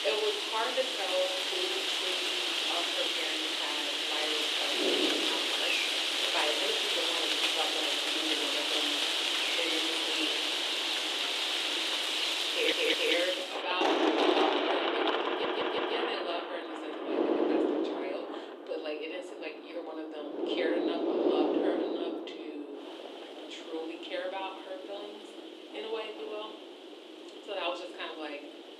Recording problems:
thin; somewhat; fading below 300 Hz
room echo; slight; dies away in 0.4 s
off-mic speech; somewhat distant
rain or running water; very loud; throughout; 8 dB above the speech
wind noise on the microphone; heavy; 4 dB below the speech
audio stuttering; at 13 s, at 15 s and at 17 s

